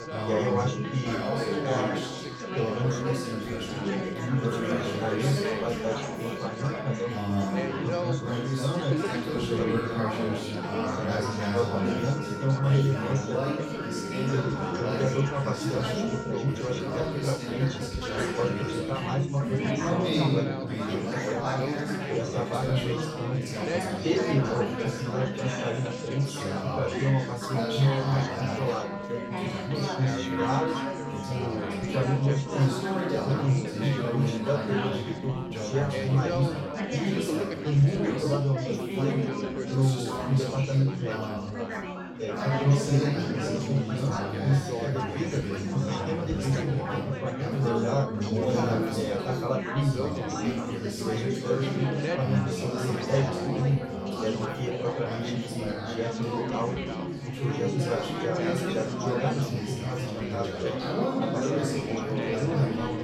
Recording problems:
off-mic speech; far
room echo; noticeable; dies away in 1.1 s
chatter from many people; very loud; throughout; 5 dB above the speech
background music; loud; throughout; 9 dB below the speech

